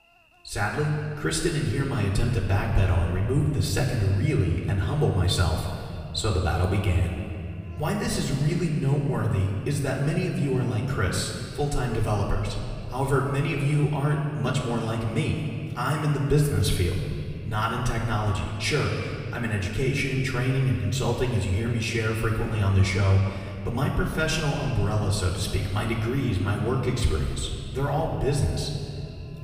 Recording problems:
off-mic speech; far
room echo; noticeable; dies away in 2.2 s
electrical hum; faint; throughout; 50 Hz, 25 dB below the speech

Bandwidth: 15 kHz